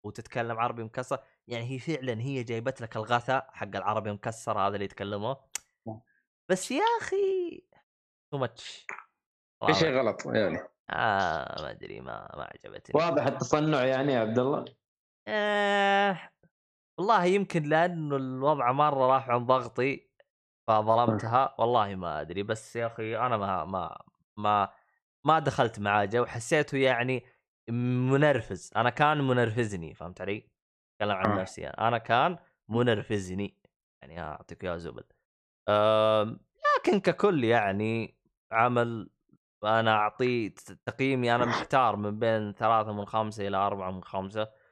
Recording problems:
none

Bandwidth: 13 kHz